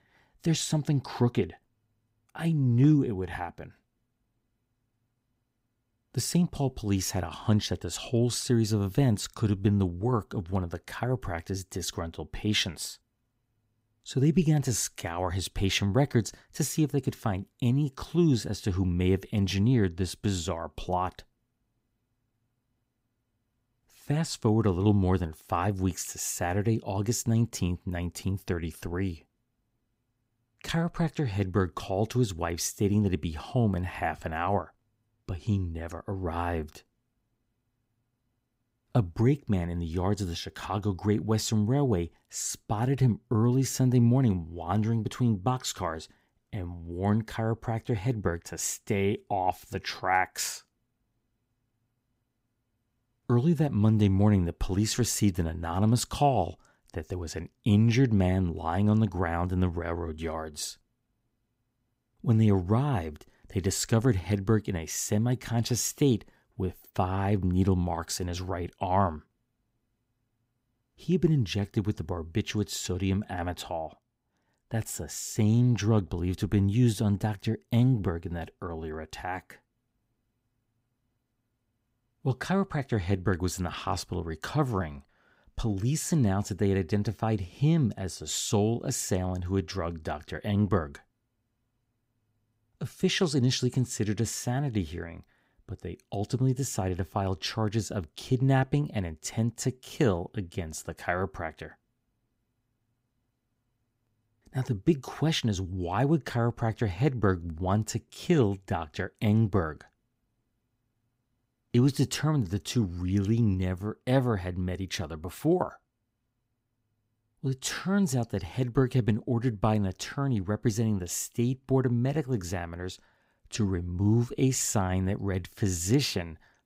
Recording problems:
none

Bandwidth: 15.5 kHz